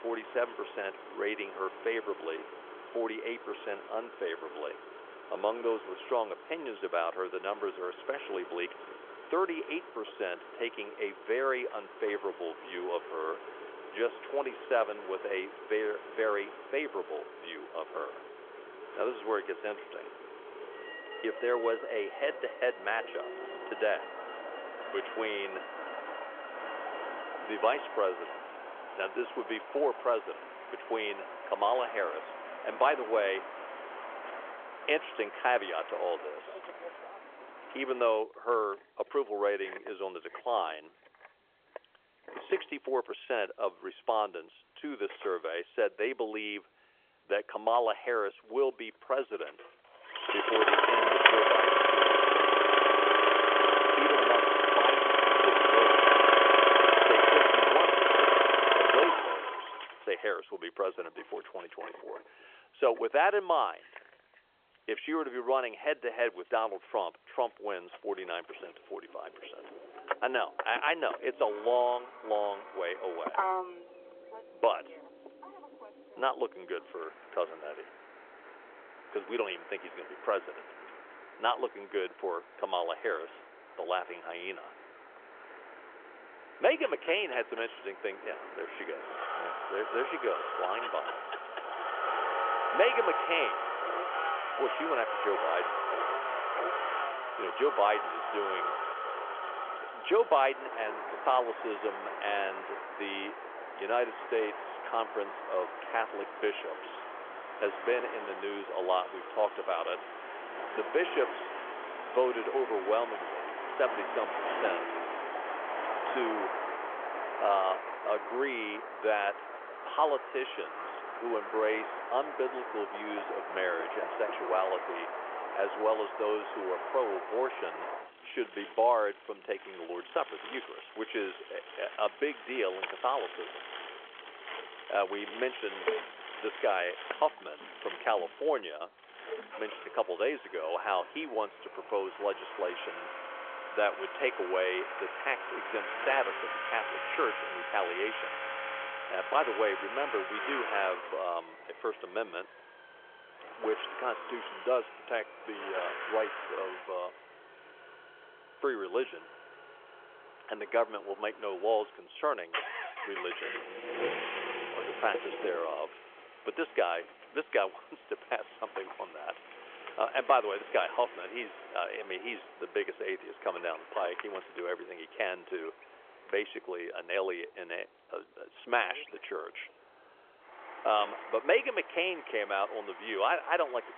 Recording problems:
phone-call audio; nothing above 3.5 kHz
traffic noise; very loud; throughout; 2 dB above the speech

